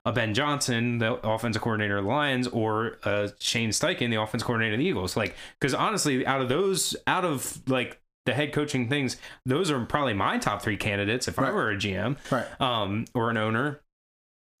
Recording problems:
squashed, flat; somewhat

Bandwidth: 15 kHz